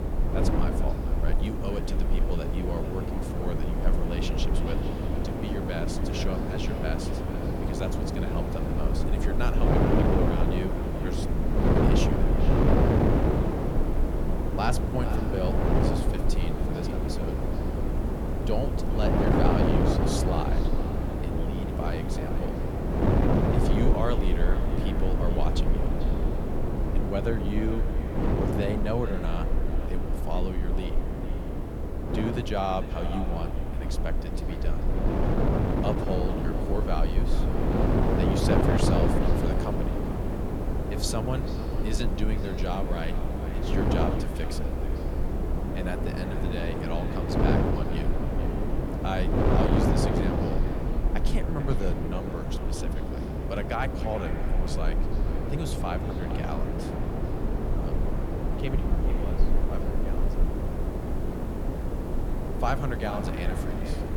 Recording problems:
echo of what is said; noticeable; throughout; 440 ms later, 10 dB below the speech
wind noise on the microphone; heavy; 2 dB above the speech
hiss; faint; throughout; 20 dB below the speech
low rumble; faint; throughout; 20 dB below the speech

